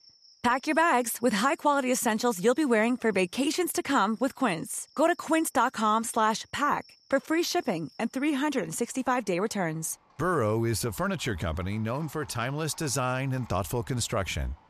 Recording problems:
animal sounds; faint; throughout; 30 dB below the speech

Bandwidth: 14 kHz